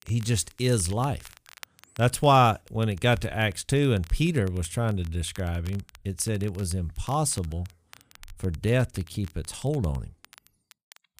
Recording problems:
crackle, like an old record; faint; 25 dB below the speech

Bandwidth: 15 kHz